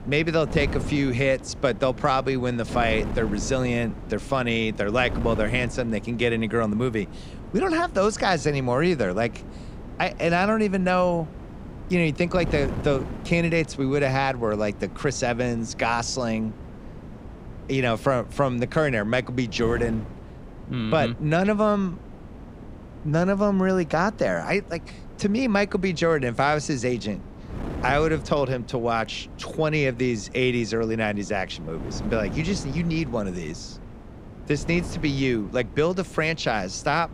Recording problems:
wind noise on the microphone; occasional gusts; 20 dB below the speech

